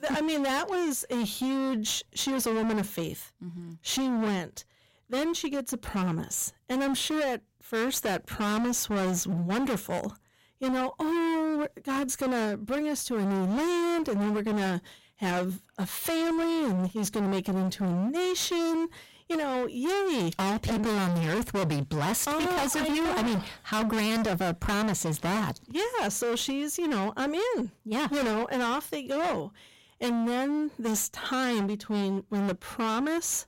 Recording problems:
distortion; heavy; 35% of the sound clipped

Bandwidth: 16 kHz